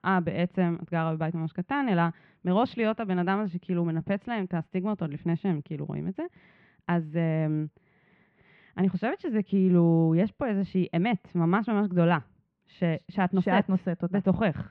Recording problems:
muffled; very; fading above 2.5 kHz

